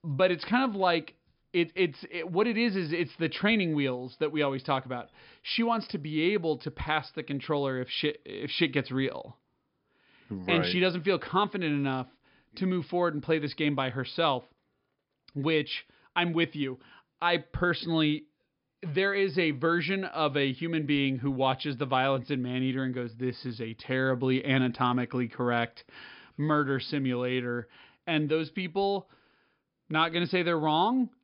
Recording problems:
high frequencies cut off; noticeable; nothing above 5.5 kHz

